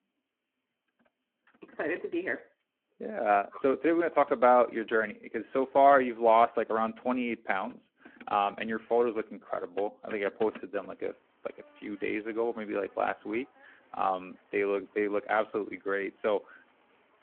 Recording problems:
phone-call audio
traffic noise; faint; throughout; 25 dB below the speech

